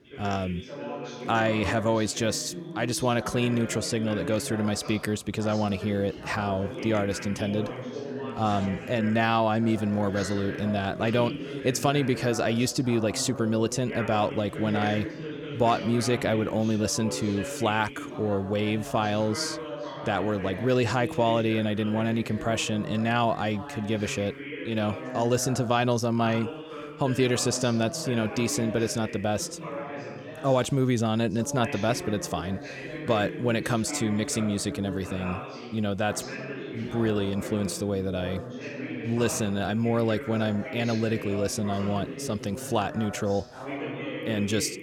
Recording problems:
background chatter; loud; throughout; 2 voices, 10 dB below the speech

